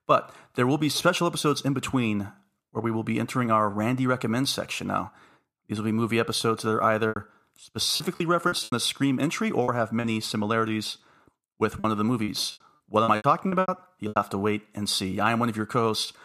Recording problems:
choppy; very; from 7 to 10 s and from 12 to 14 s; 16% of the speech affected

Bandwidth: 14.5 kHz